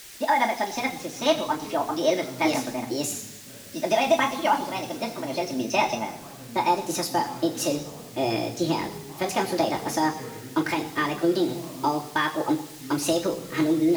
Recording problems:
wrong speed and pitch; too fast and too high; 1.5 times normal speed
room echo; slight; dies away in 0.8 s
off-mic speech; somewhat distant
background chatter; noticeable; throughout; 2 voices, 15 dB below the speech
hiss; noticeable; throughout; 15 dB below the speech
abrupt cut into speech; at the end

